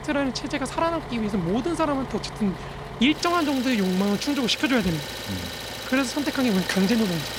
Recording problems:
traffic noise; loud; throughout; 9 dB below the speech

